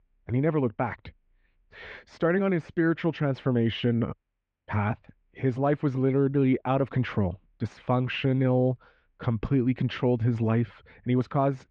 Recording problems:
muffled; very; fading above 2.5 kHz

